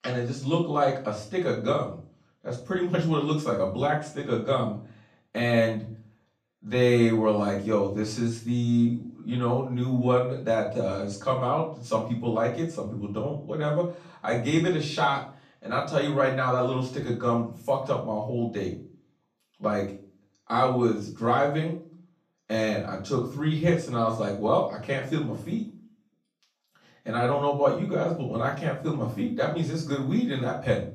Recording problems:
off-mic speech; far
room echo; noticeable; dies away in 0.4 s

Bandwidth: 14.5 kHz